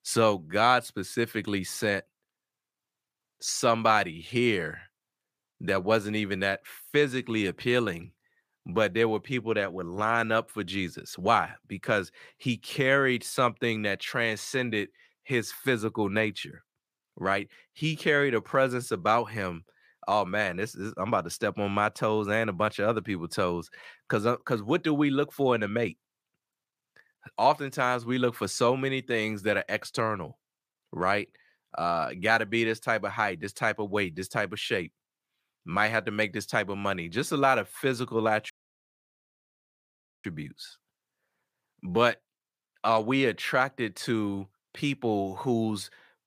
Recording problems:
audio cutting out; at 39 s for 1.5 s

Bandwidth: 15 kHz